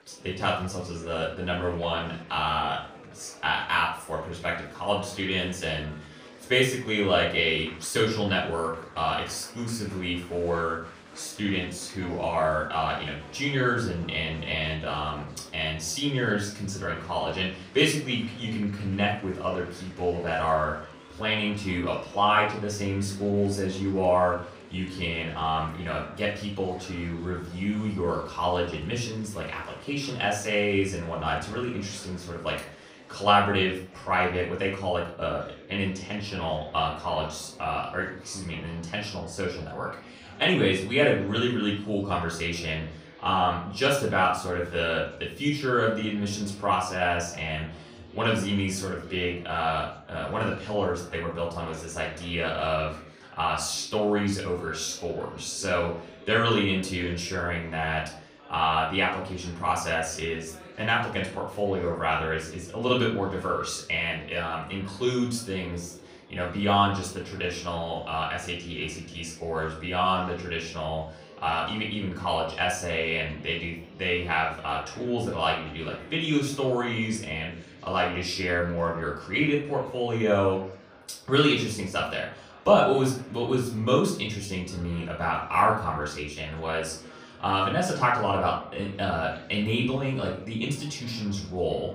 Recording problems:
off-mic speech; far
room echo; slight; dies away in 0.4 s
chatter from many people; faint; throughout; 20 dB below the speech

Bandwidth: 15.5 kHz